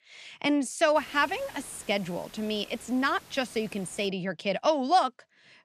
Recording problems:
hiss; faint; from 1 to 4 s; 20 dB below the speech

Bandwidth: 14.5 kHz